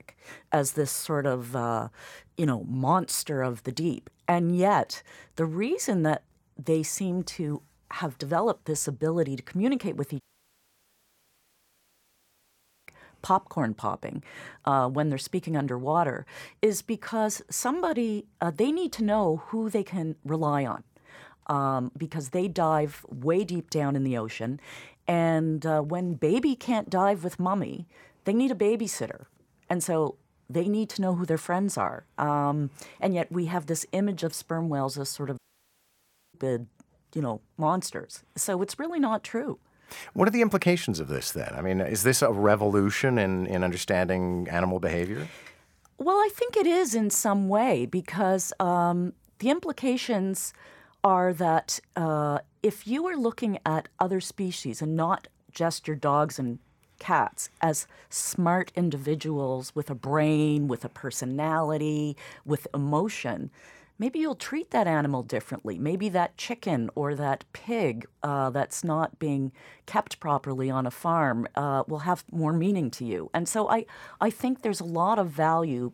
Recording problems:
audio cutting out; at 10 s for 2.5 s and at 35 s for 1 s

